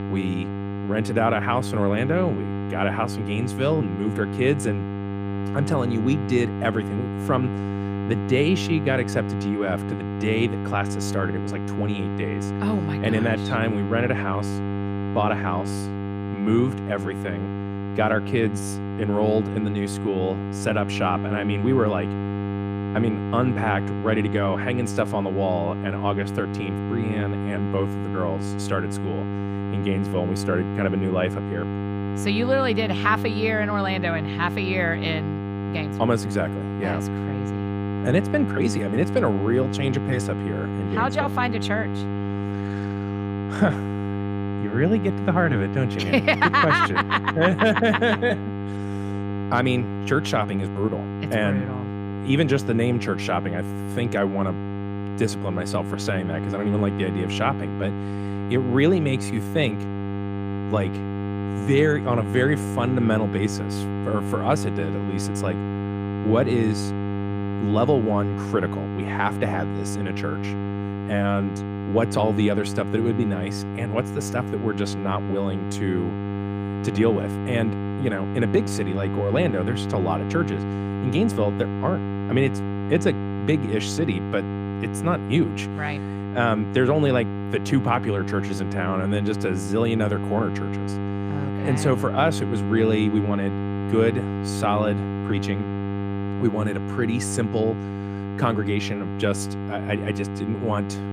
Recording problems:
electrical hum; loud; throughout; 50 Hz, 8 dB below the speech

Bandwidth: 15 kHz